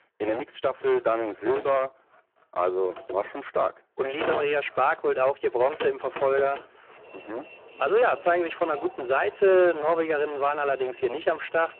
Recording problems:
phone-call audio; poor line
distortion; slight; 6% of the sound clipped
traffic noise; noticeable; throughout; 15 dB below the speech

